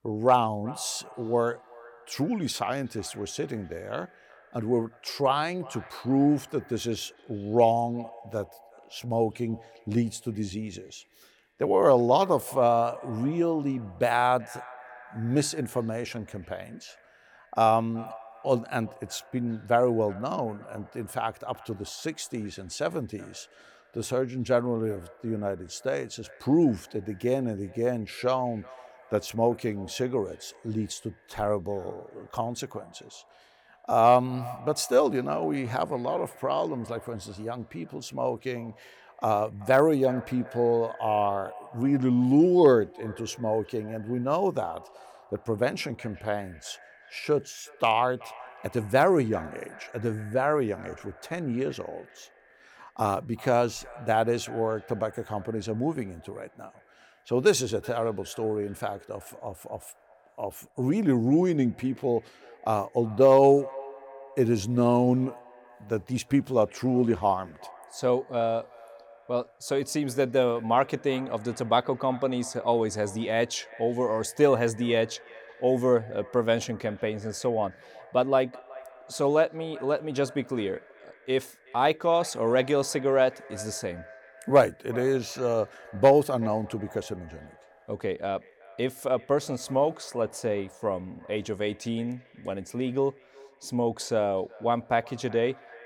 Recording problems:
echo of what is said; faint; throughout; 370 ms later, 20 dB below the speech

